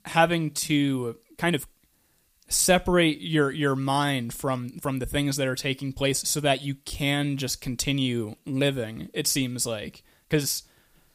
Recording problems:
uneven, jittery; strongly; from 0.5 to 11 s

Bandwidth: 15 kHz